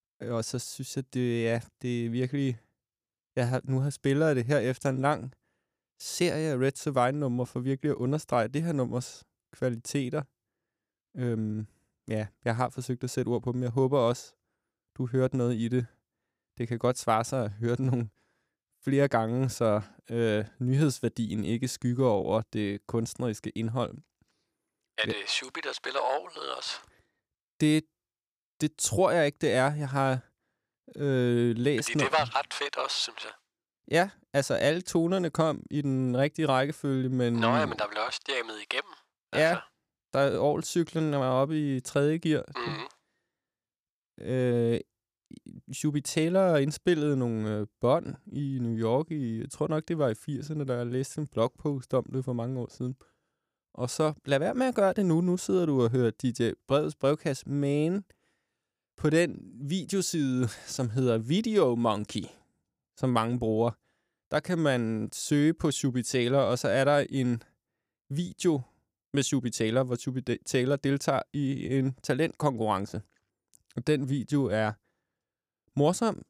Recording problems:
none

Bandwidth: 15 kHz